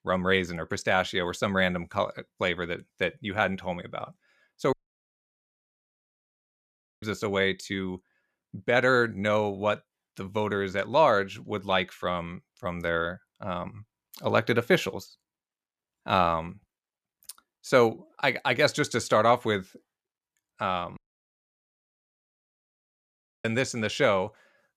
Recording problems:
audio cutting out; at 4.5 s for 2.5 s and at 21 s for 2.5 s

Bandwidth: 14.5 kHz